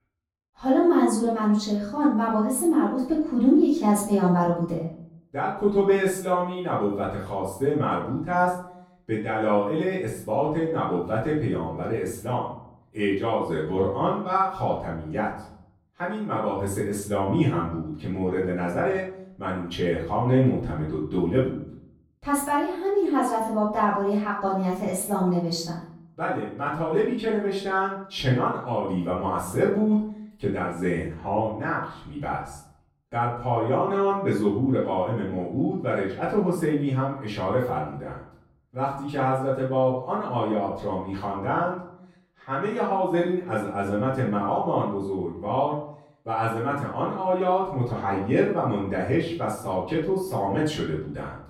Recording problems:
off-mic speech; far
room echo; noticeable; dies away in 0.6 s

